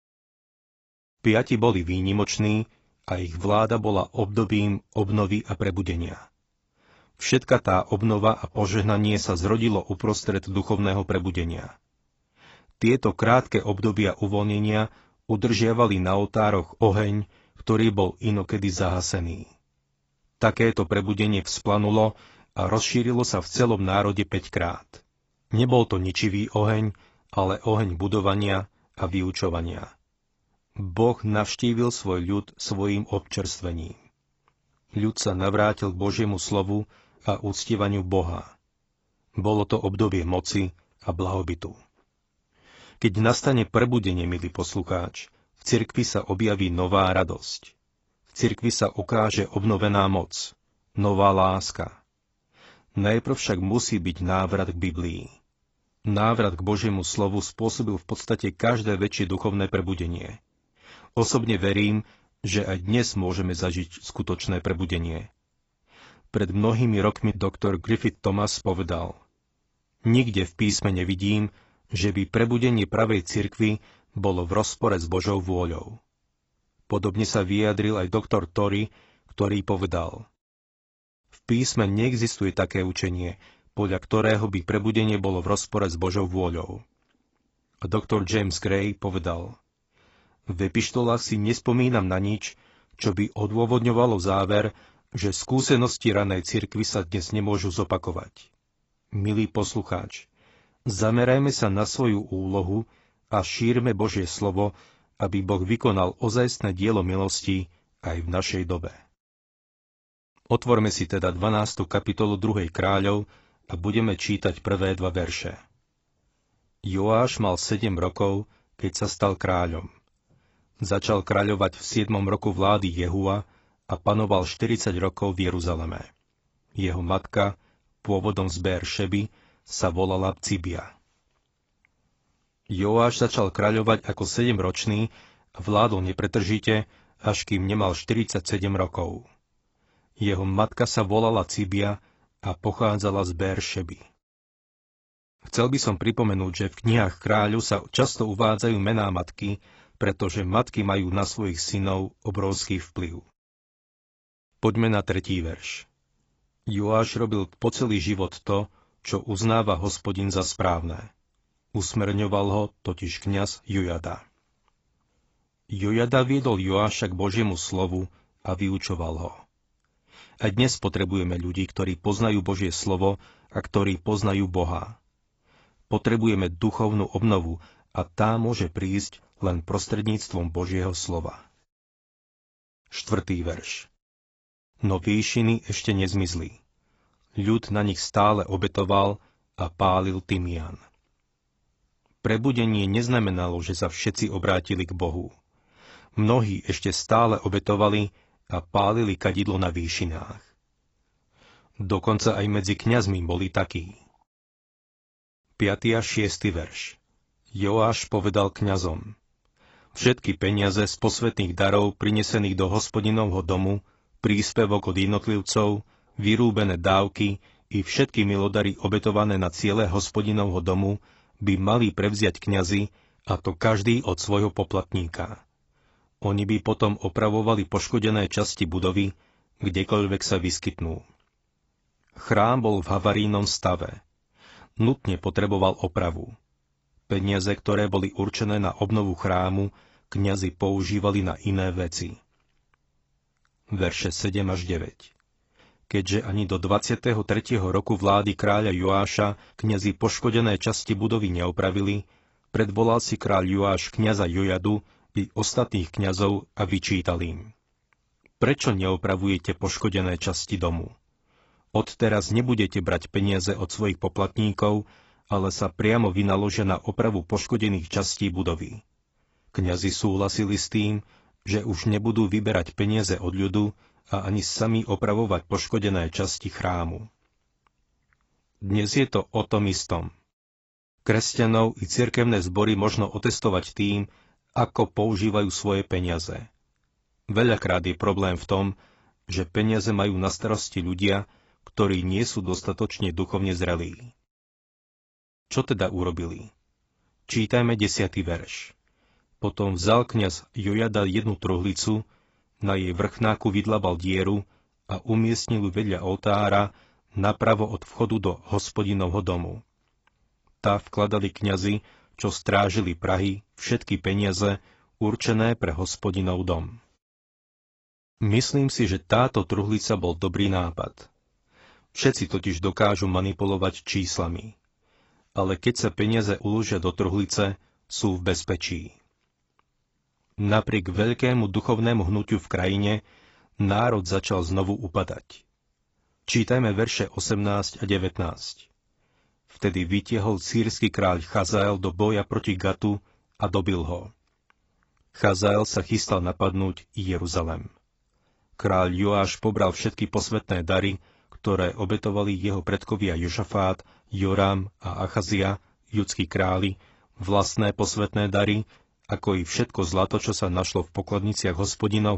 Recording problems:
garbled, watery; badly; nothing above 7.5 kHz
abrupt cut into speech; at the end

